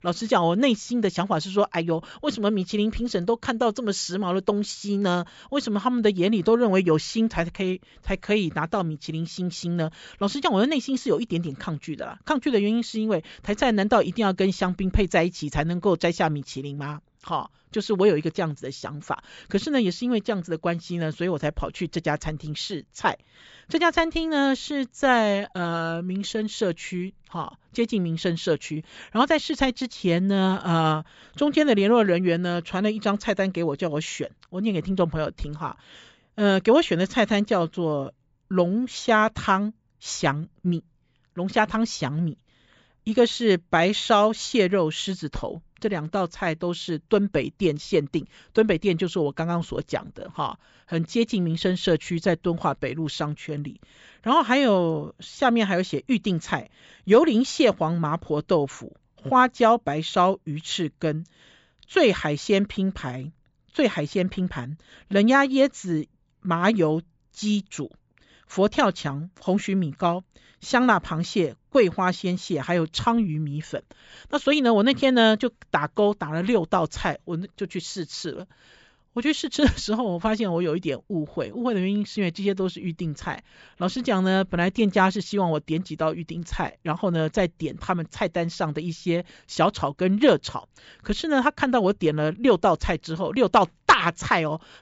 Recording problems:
high frequencies cut off; noticeable; nothing above 8 kHz

